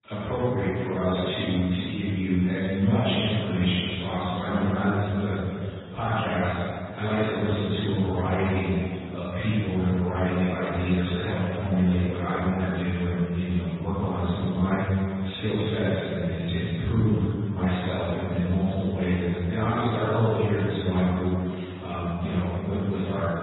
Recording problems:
room echo; strong; dies away in 2 s
off-mic speech; far
garbled, watery; badly; nothing above 4 kHz

